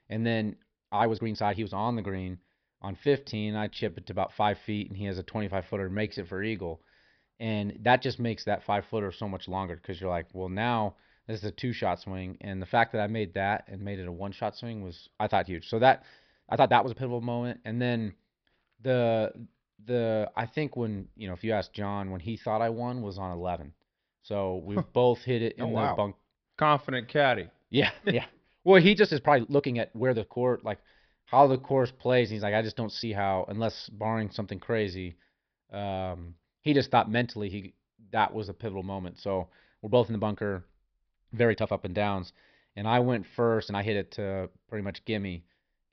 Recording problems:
high frequencies cut off; noticeable; nothing above 5.5 kHz
uneven, jittery; strongly; from 1 to 44 s

